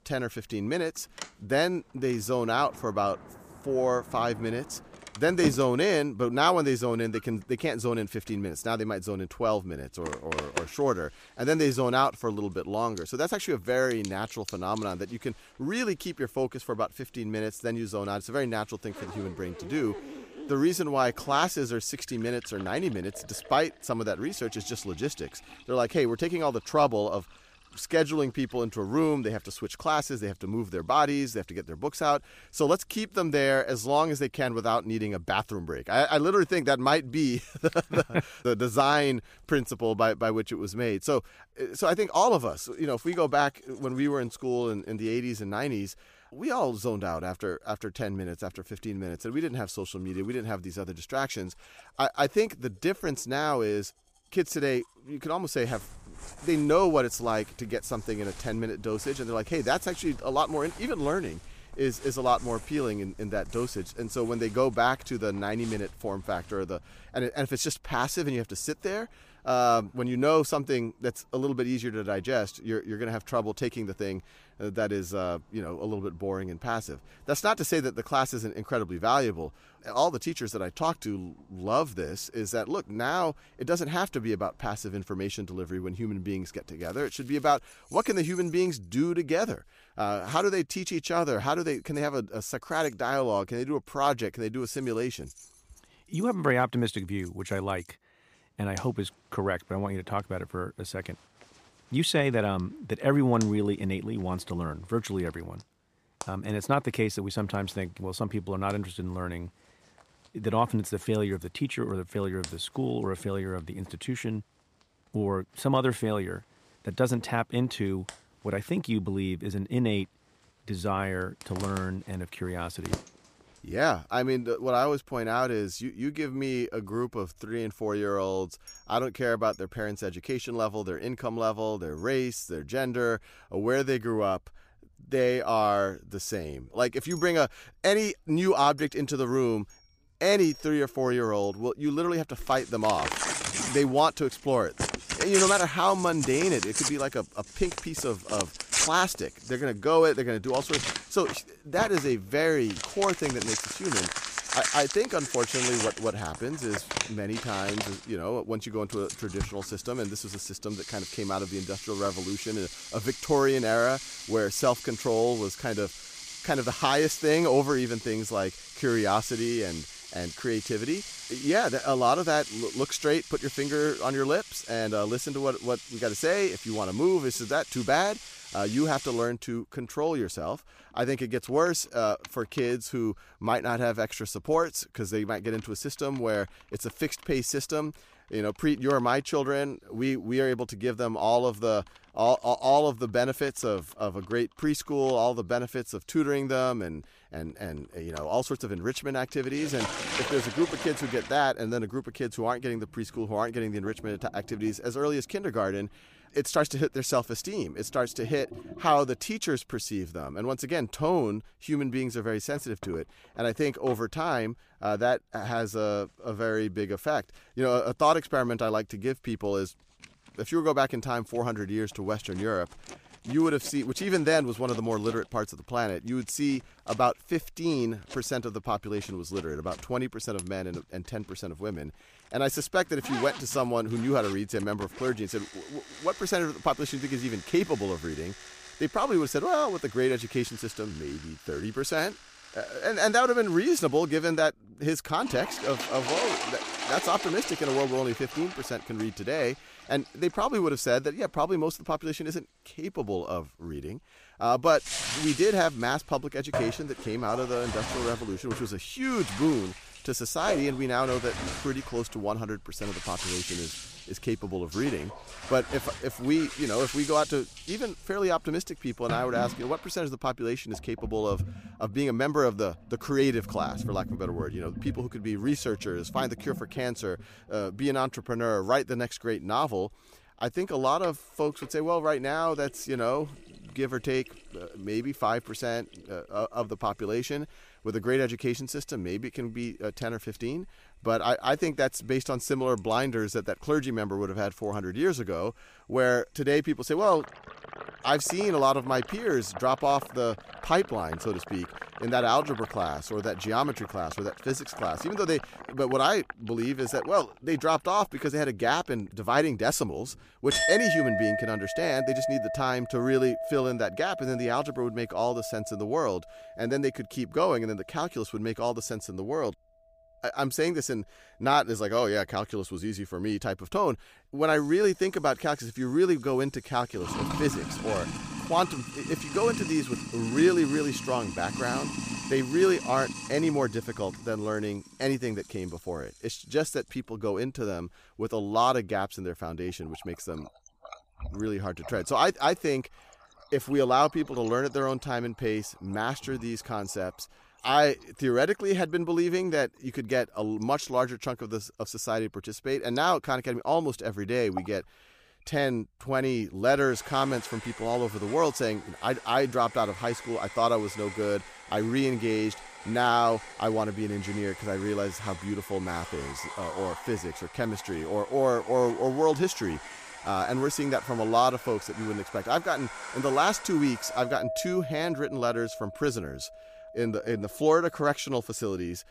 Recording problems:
household noises; loud; throughout; 9 dB below the speech
crackling; faint; at 1:27; 25 dB below the speech

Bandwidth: 15 kHz